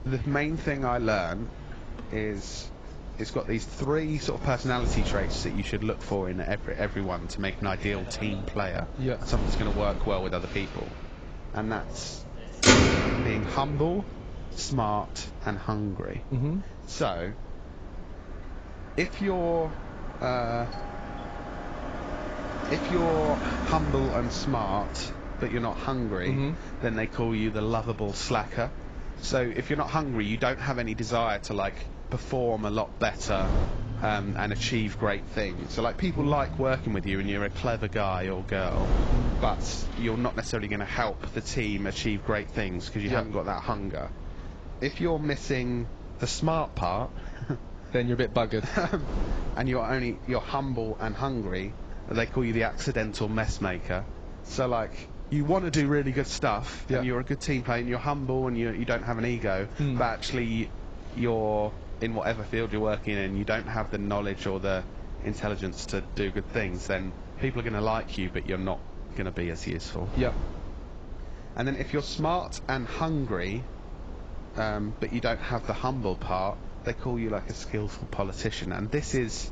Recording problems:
garbled, watery; badly; nothing above 7.5 kHz
traffic noise; loud; throughout; 4 dB below the speech
wind noise on the microphone; occasional gusts; 15 dB below the speech
doorbell; faint; from 21 to 22 s; peak 15 dB below the speech

